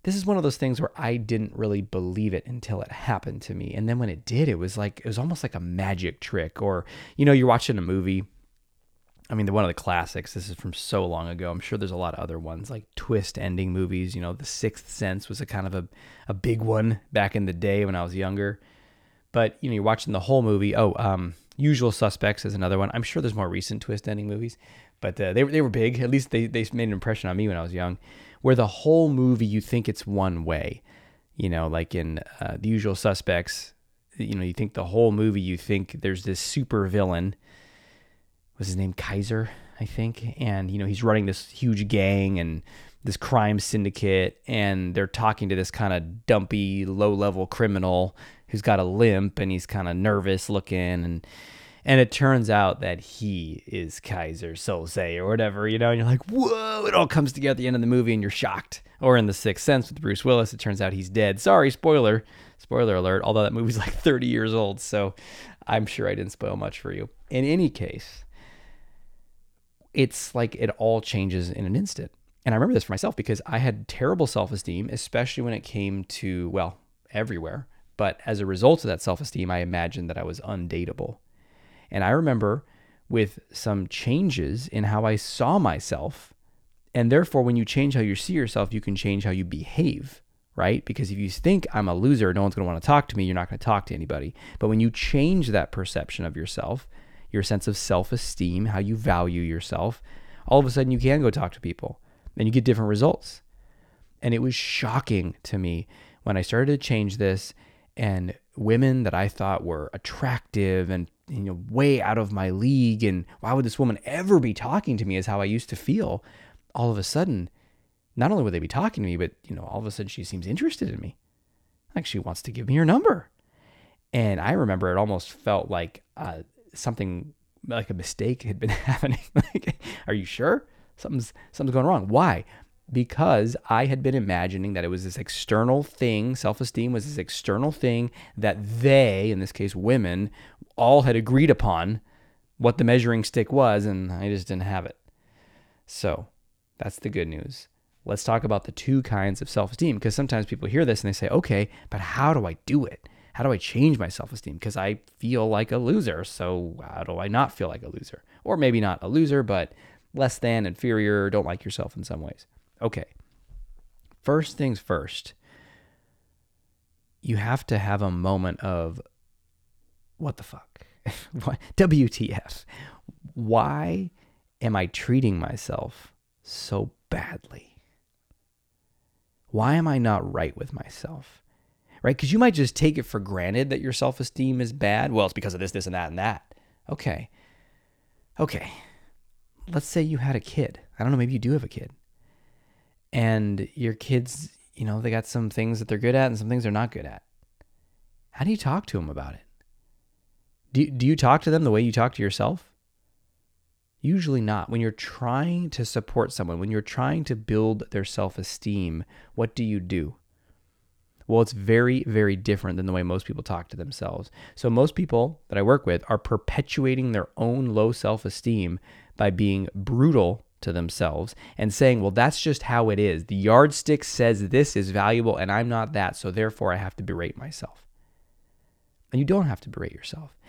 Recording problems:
uneven, jittery; strongly; from 13 s to 3:49

